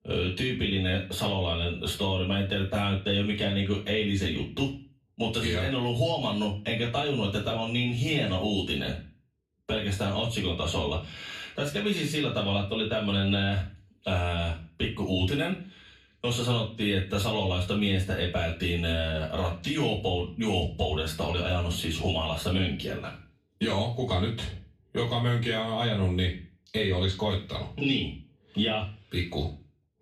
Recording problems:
off-mic speech; far
room echo; slight; dies away in 0.3 s

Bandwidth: 14.5 kHz